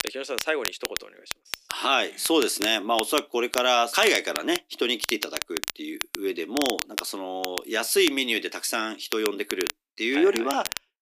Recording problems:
thin; somewhat; fading below 300 Hz
crackle, like an old record; loud; 8 dB below the speech

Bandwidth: 15 kHz